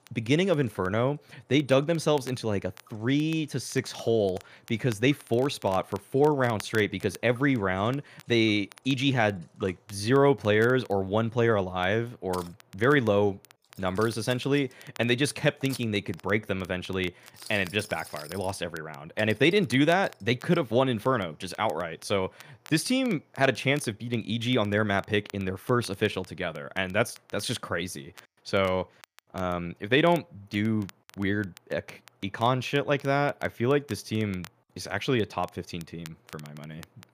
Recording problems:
household noises; faint; throughout; 25 dB below the speech
crackle, like an old record; faint; 25 dB below the speech

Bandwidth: 15 kHz